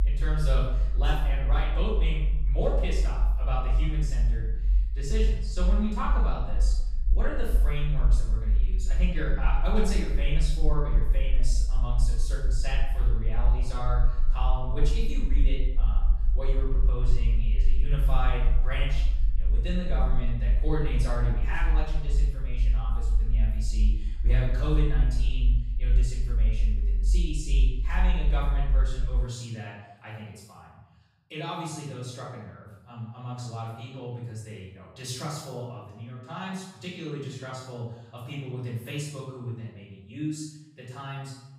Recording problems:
off-mic speech; far
room echo; noticeable; dies away in 0.8 s
low rumble; noticeable; until 29 s; 15 dB below the speech

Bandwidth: 15.5 kHz